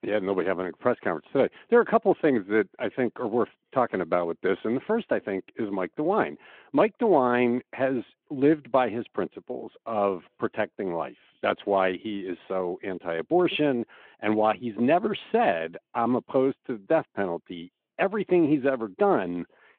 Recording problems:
phone-call audio

